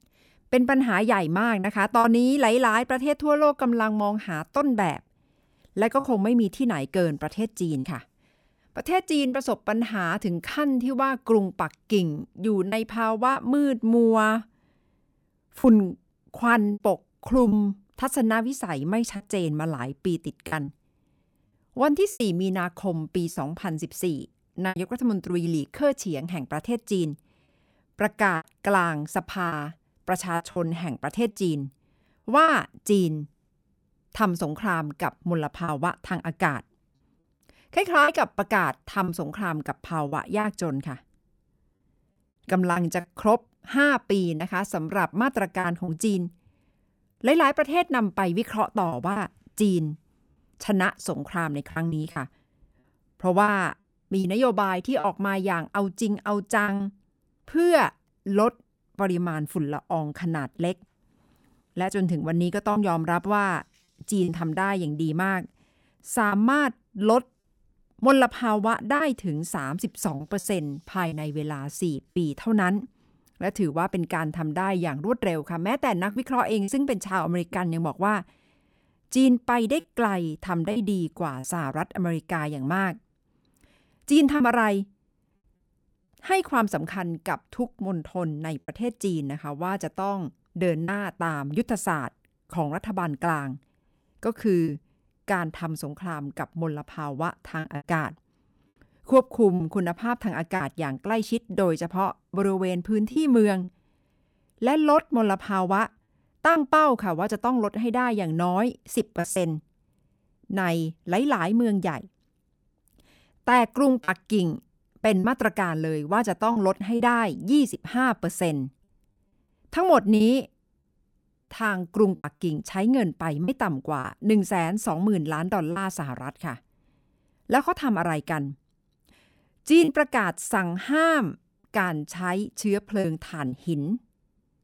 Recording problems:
choppy; occasionally; 4% of the speech affected

